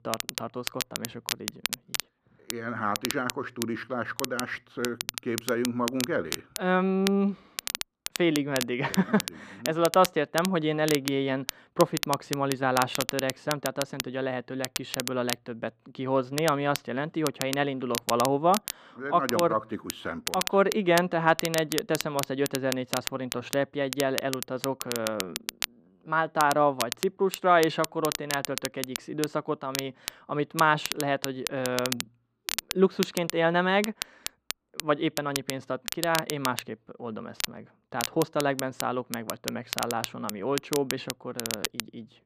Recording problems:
muffled; very; fading above 2.5 kHz
crackle, like an old record; loud; 6 dB below the speech

